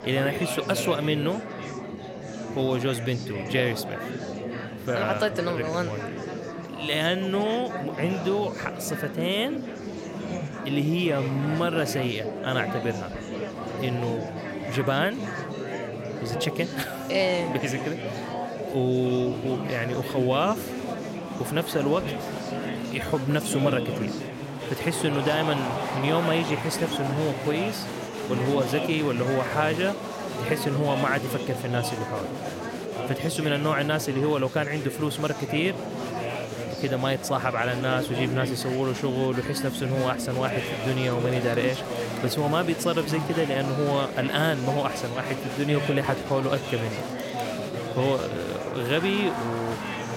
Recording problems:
murmuring crowd; loud; throughout; 5 dB below the speech

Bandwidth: 16 kHz